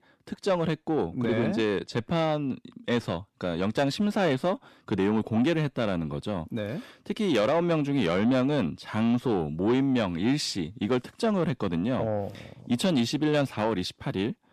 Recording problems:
distortion; slight; 10 dB below the speech

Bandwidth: 14 kHz